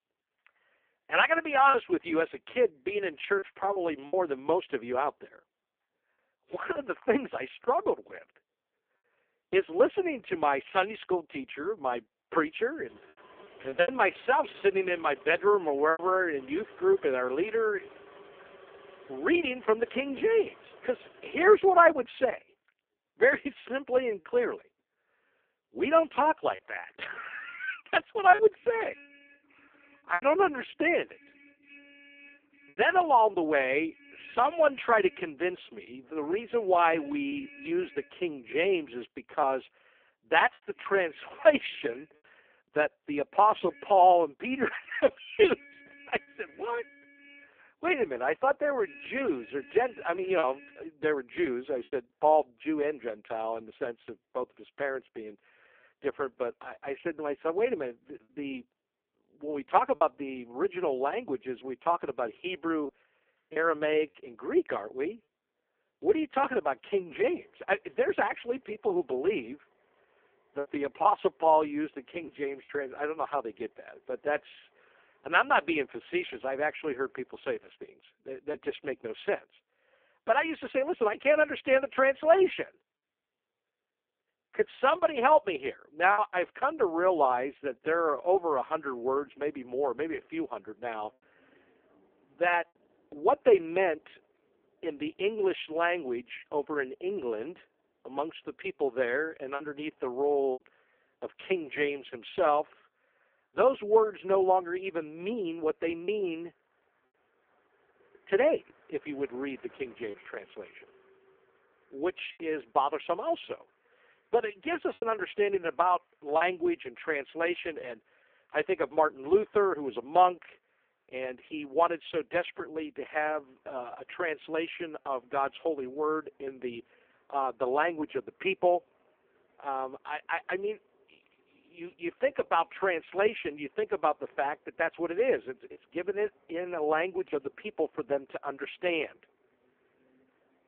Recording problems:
phone-call audio; poor line
traffic noise; faint; throughout; 25 dB below the speech
choppy; occasionally; 2% of the speech affected

